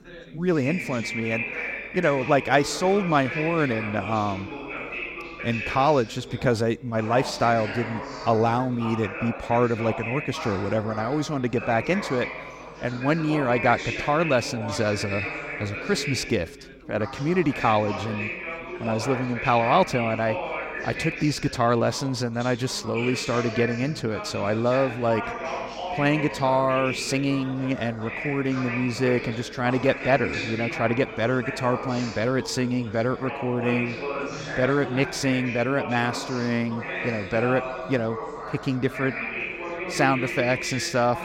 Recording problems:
background chatter; loud; throughout; 4 voices, 7 dB below the speech

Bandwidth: 16 kHz